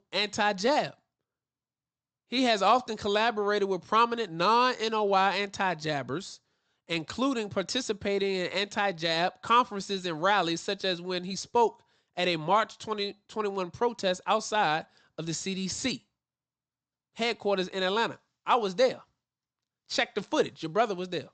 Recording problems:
high frequencies cut off; noticeable; nothing above 8 kHz

